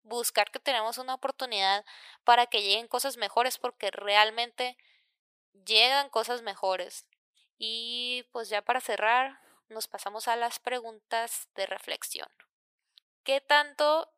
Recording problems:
thin; very; fading below 650 Hz

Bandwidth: 15 kHz